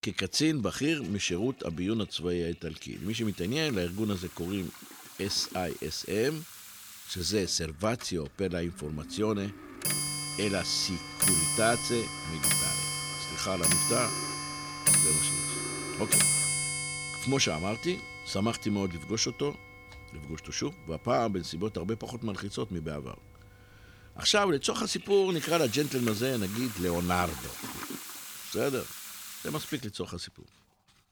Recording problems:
household noises; very loud; throughout; 2 dB above the speech

